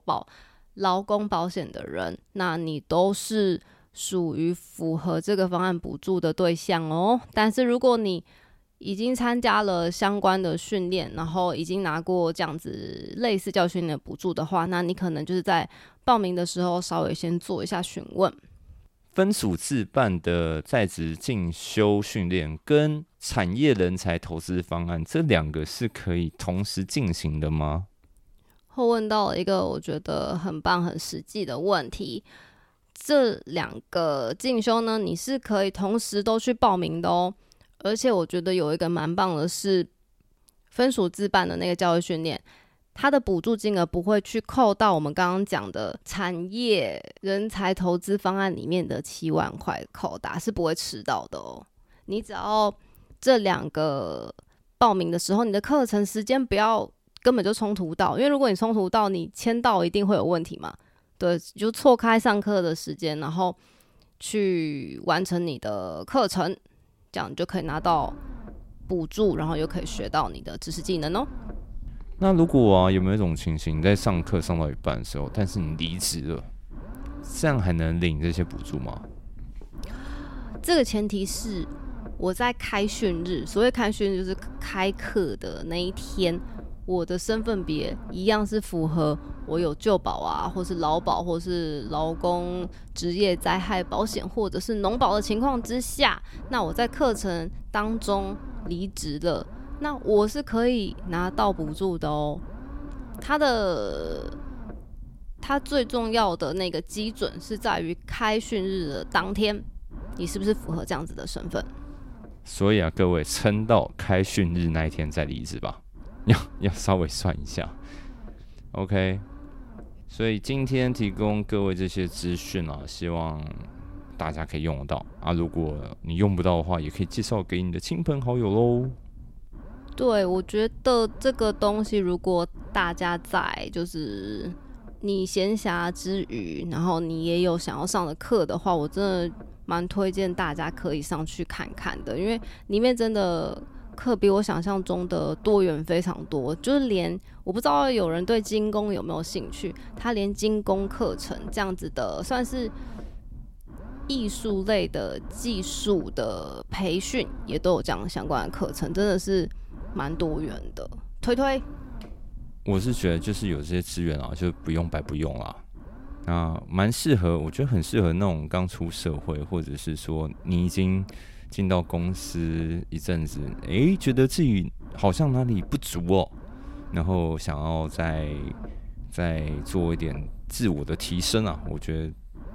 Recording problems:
low rumble; faint; from 1:08 on; 20 dB below the speech

